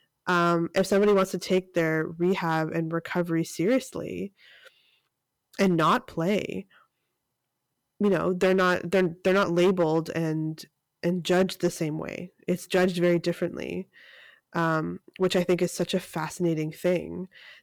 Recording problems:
distortion; slight; 4% of the sound clipped

